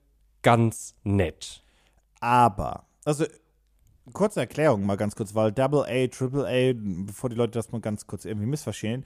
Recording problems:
none

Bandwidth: 14.5 kHz